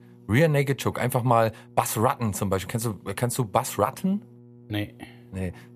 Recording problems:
electrical hum; faint; throughout; 60 Hz, 30 dB below the speech

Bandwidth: 14.5 kHz